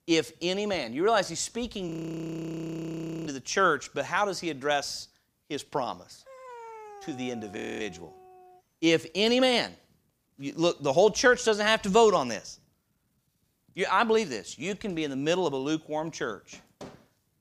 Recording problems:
audio freezing; at 2 s for 1.5 s and at 7.5 s
dog barking; faint; from 6.5 to 8.5 s; peak 15 dB below the speech

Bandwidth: 15 kHz